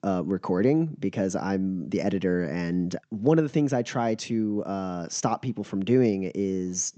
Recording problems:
high frequencies cut off; noticeable; nothing above 8 kHz

